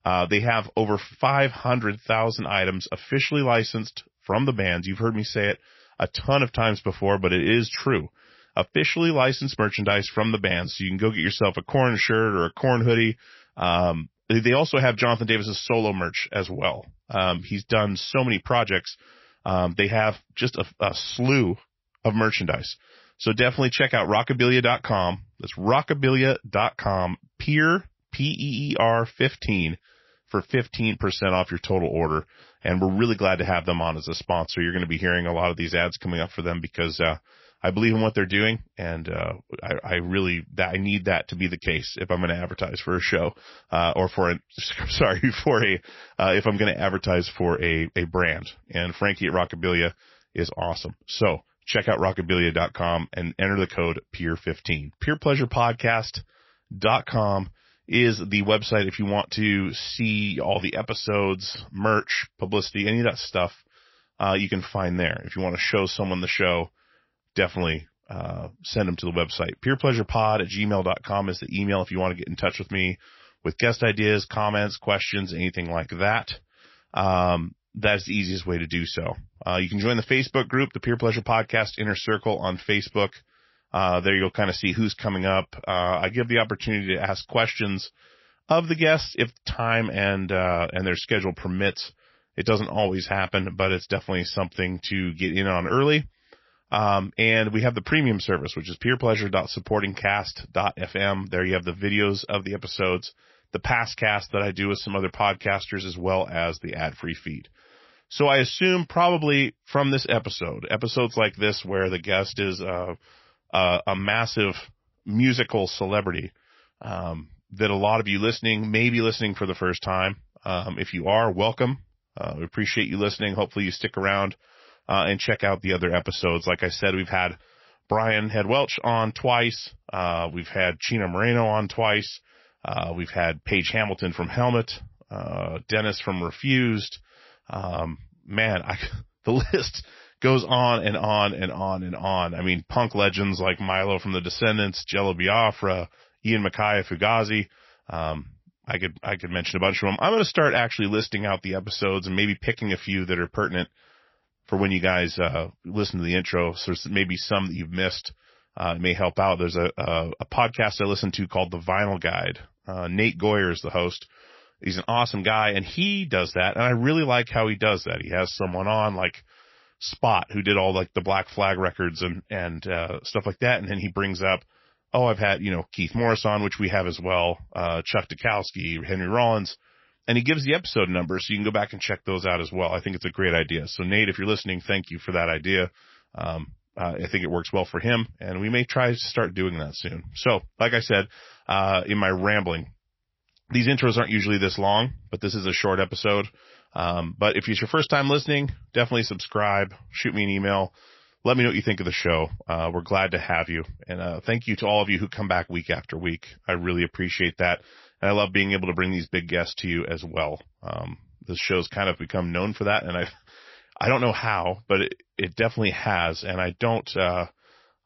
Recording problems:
garbled, watery; slightly; nothing above 5.5 kHz

